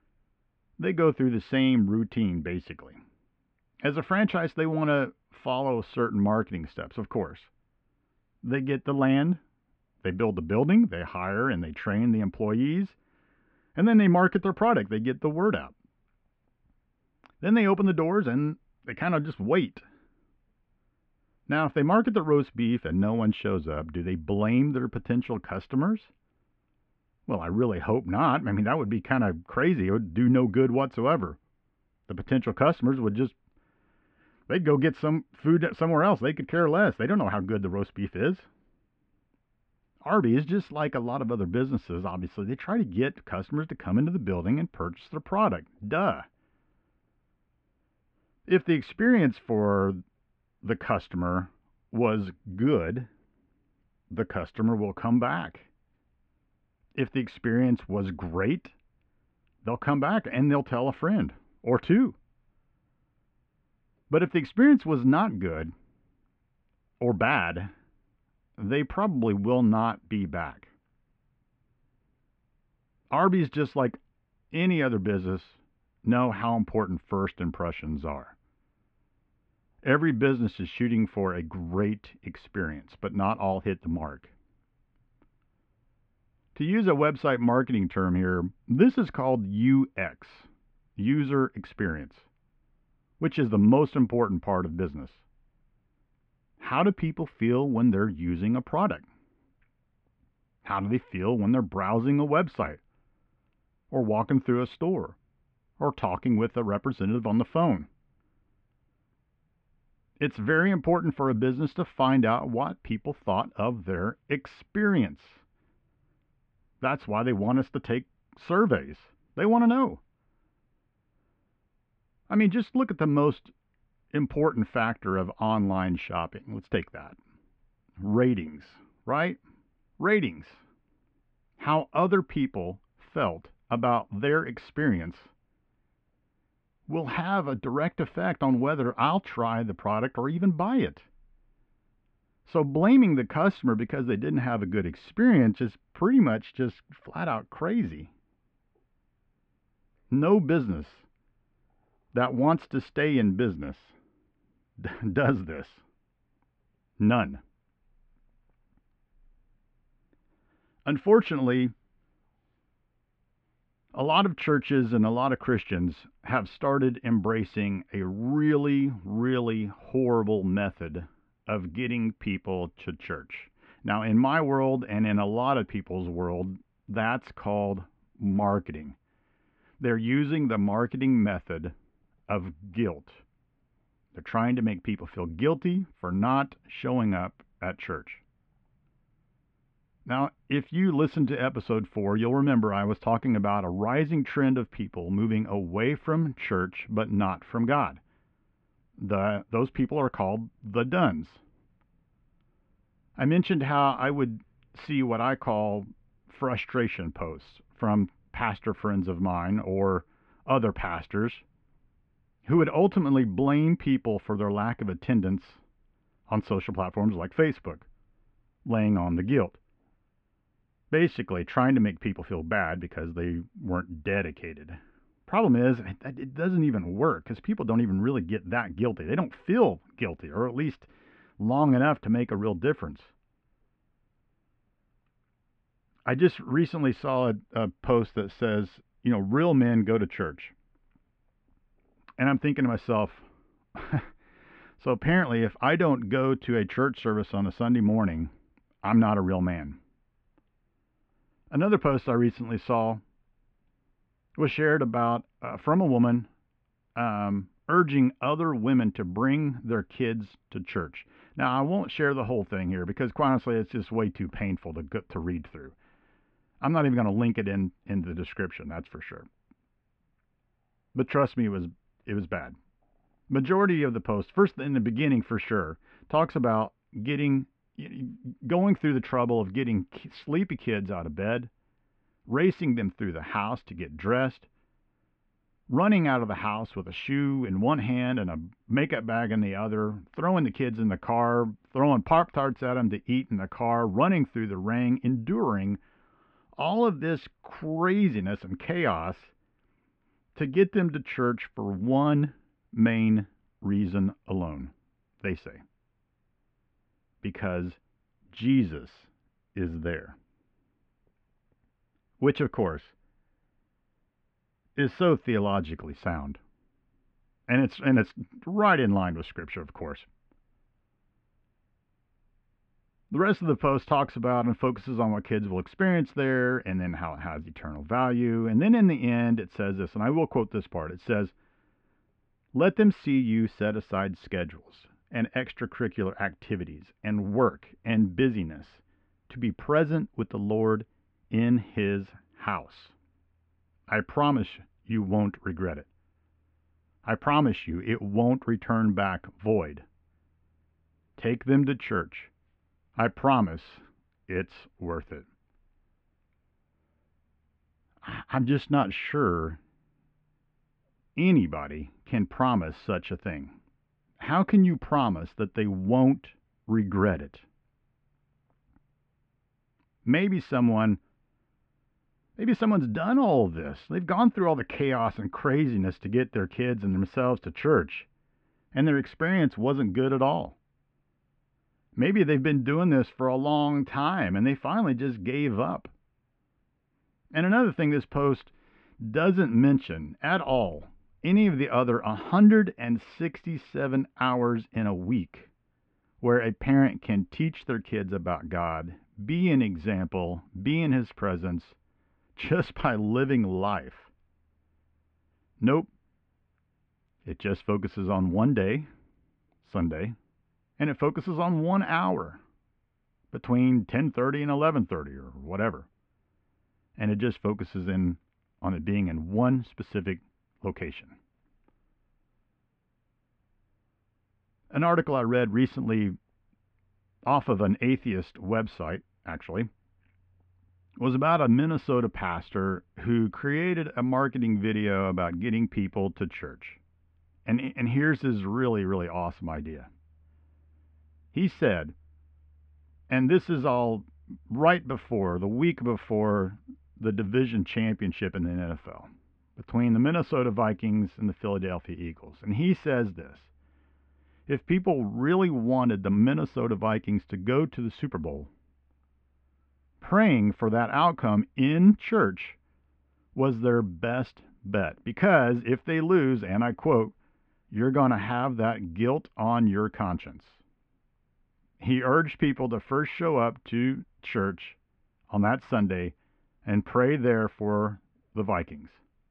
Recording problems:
muffled; very; fading above 2.5 kHz

